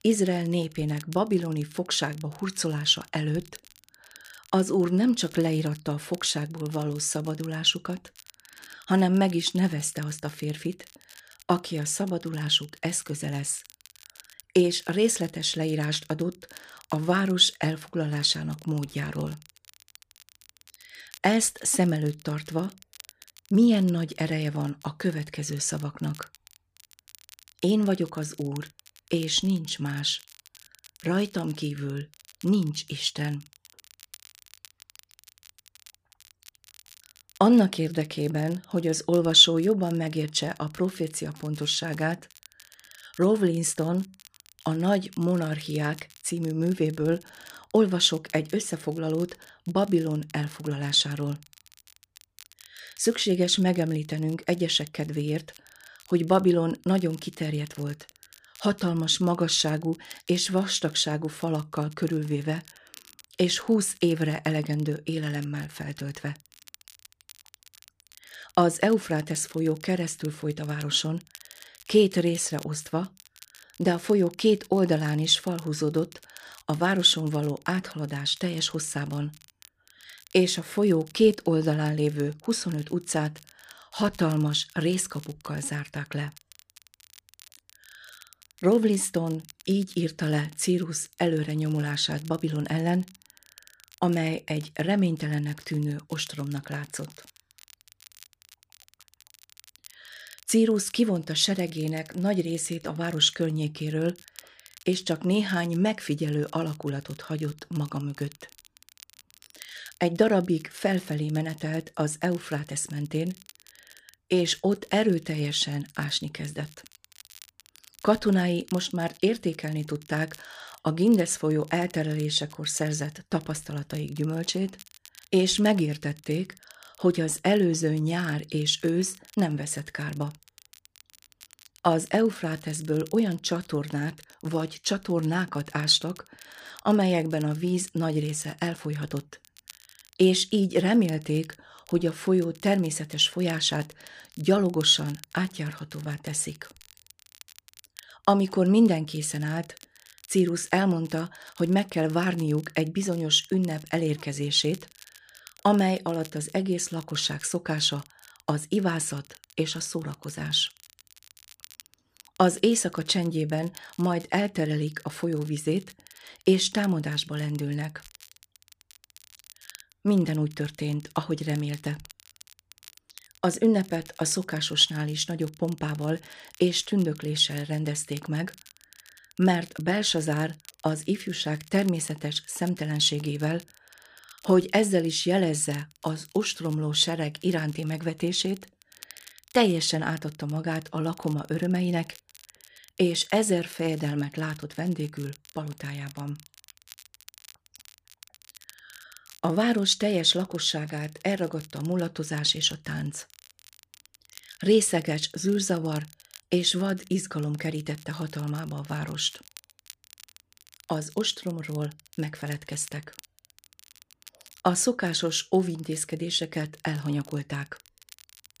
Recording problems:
crackle, like an old record; faint; 25 dB below the speech

